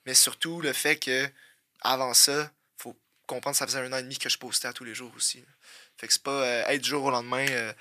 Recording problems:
thin; somewhat; fading below 650 Hz

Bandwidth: 14.5 kHz